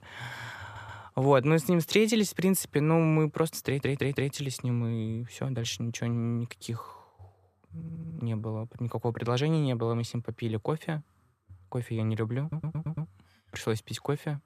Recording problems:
audio stuttering; 4 times, first at 0.5 s

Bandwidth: 14.5 kHz